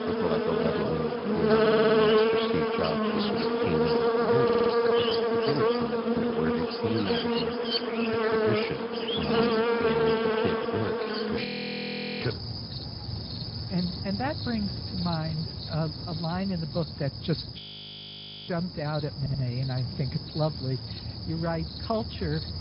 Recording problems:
garbled, watery; badly
high frequencies cut off; noticeable; nothing above 5 kHz
animal sounds; very loud; throughout; 5 dB above the speech
audio stuttering; at 1.5 s, at 4.5 s and at 19 s
audio freezing; at 11 s for 1 s and at 18 s for 1 s

